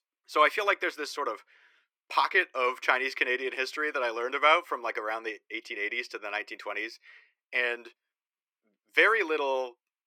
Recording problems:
thin; very; fading below 350 Hz

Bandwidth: 17 kHz